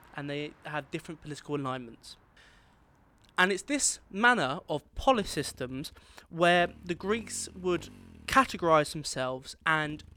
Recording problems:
traffic noise; faint; throughout; 25 dB below the speech

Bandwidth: 18.5 kHz